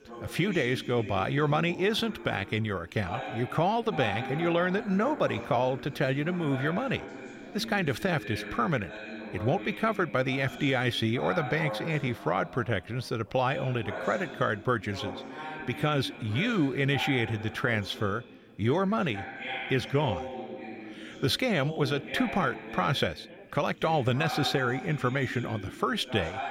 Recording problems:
background chatter; noticeable; throughout; 3 voices, 10 dB below the speech

